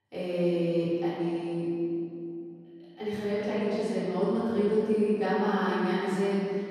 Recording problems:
room echo; strong; dies away in 2.5 s
off-mic speech; far

